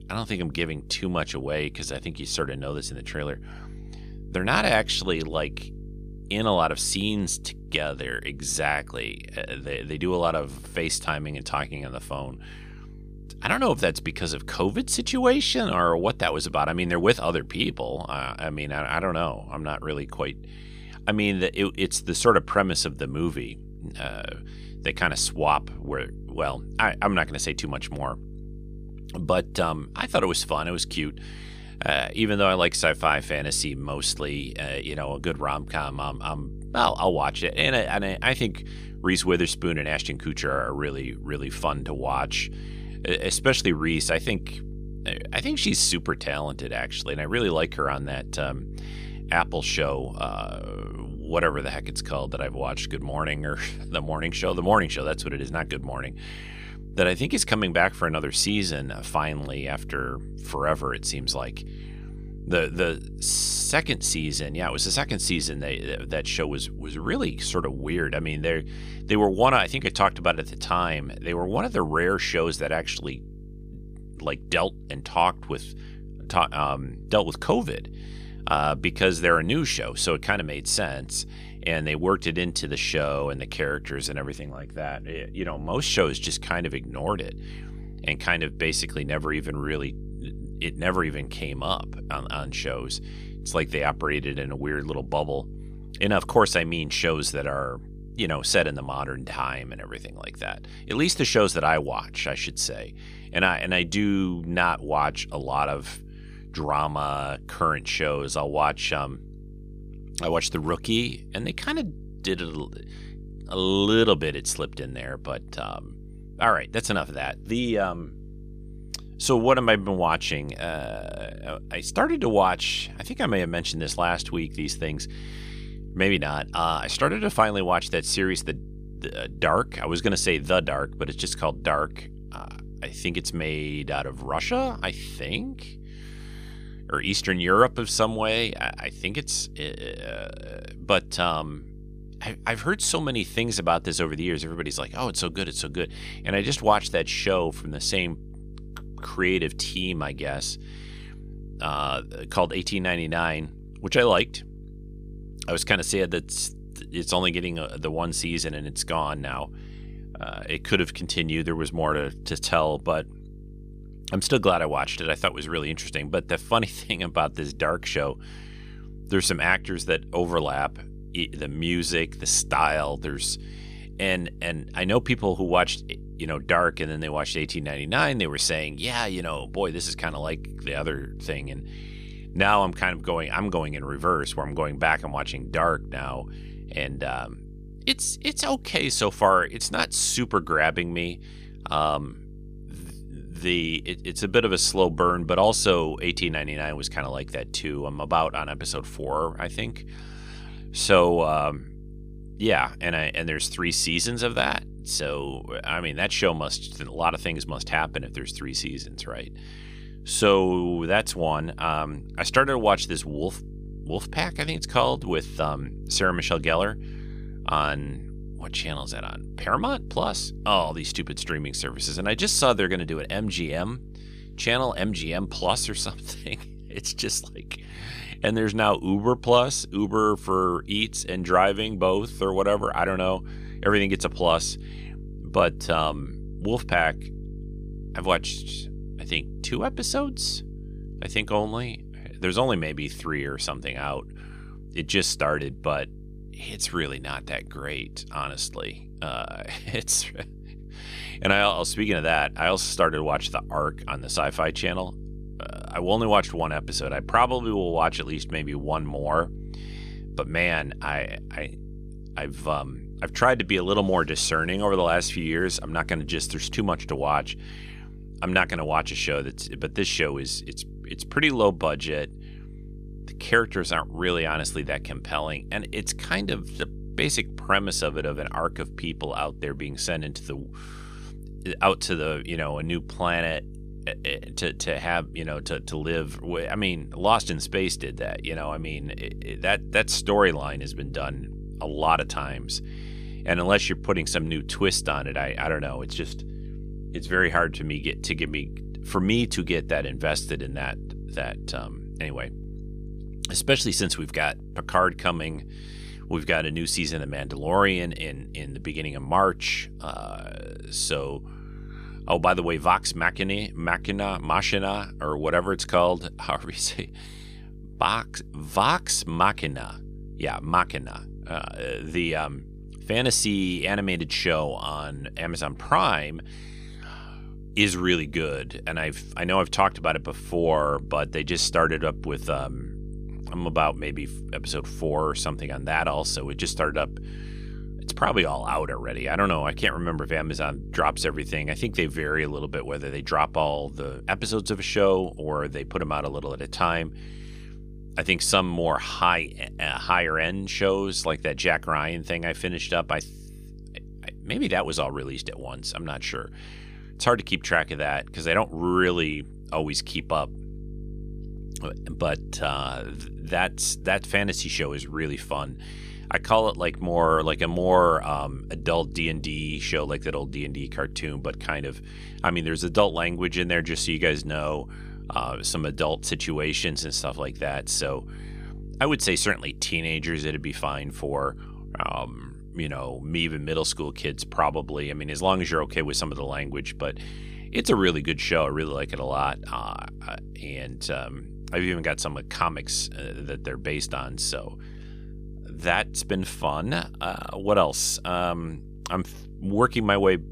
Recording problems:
electrical hum; faint; throughout; 50 Hz, 25 dB below the speech

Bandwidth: 15 kHz